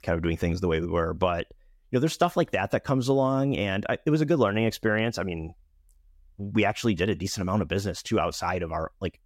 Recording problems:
none

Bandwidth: 16.5 kHz